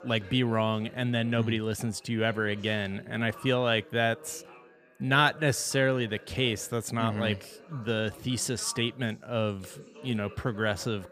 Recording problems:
background chatter; faint; throughout; 3 voices, 20 dB below the speech

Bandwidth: 15 kHz